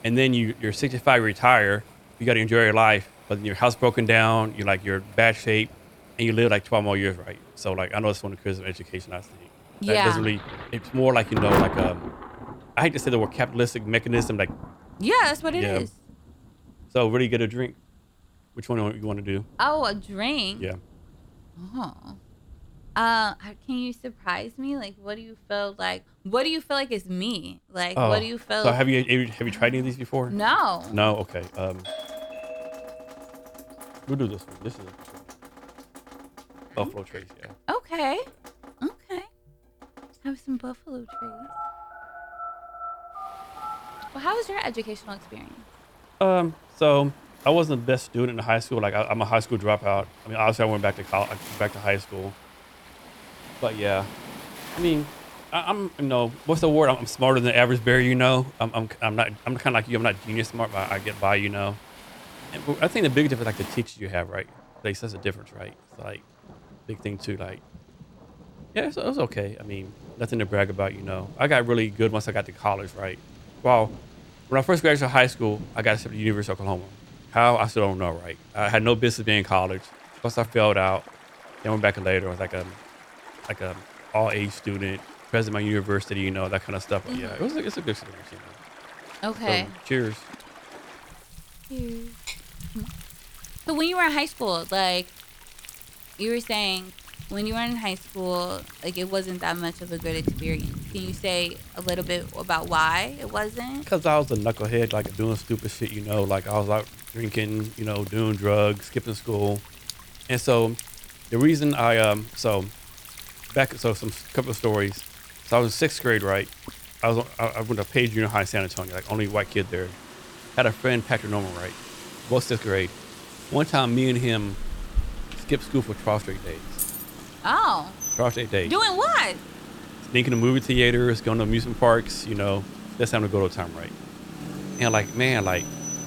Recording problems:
rain or running water; noticeable; throughout; 15 dB below the speech
doorbell; faint; from 32 to 34 s; peak 10 dB below the speech
phone ringing; faint; from 41 to 44 s; peak 10 dB below the speech
jangling keys; noticeable; at 2:07; peak 4 dB below the speech

